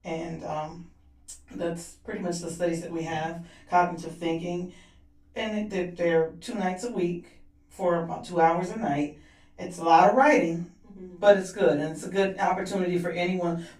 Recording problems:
off-mic speech; far
room echo; slight; dies away in 0.3 s

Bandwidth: 15.5 kHz